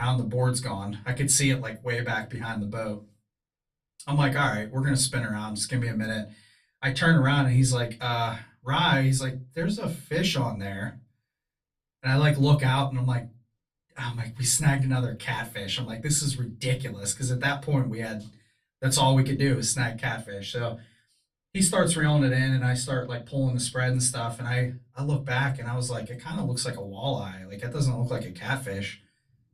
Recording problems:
off-mic speech; far
room echo; very slight; dies away in 0.3 s
abrupt cut into speech; at the start

